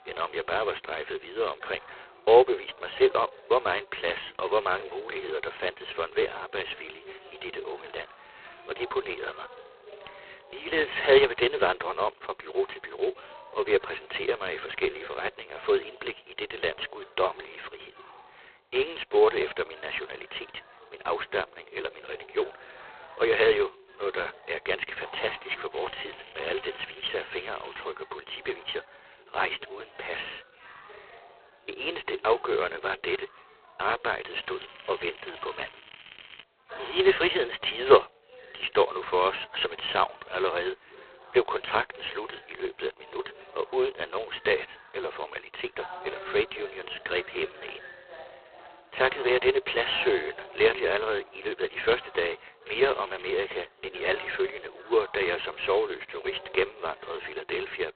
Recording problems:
phone-call audio; poor line; nothing above 4 kHz
crackling; noticeable; from 26 to 28 s, from 34 to 36 s and at 53 s; 20 dB below the speech
background chatter; faint; throughout; 2 voices, 20 dB below the speech

